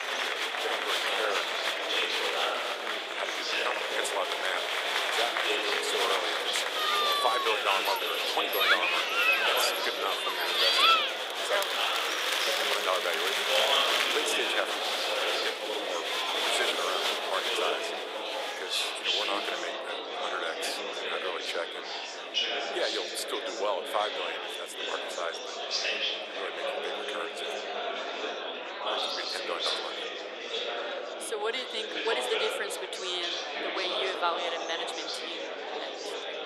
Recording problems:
thin; very; fading below 450 Hz
murmuring crowd; very loud; throughout; 6 dB above the speech

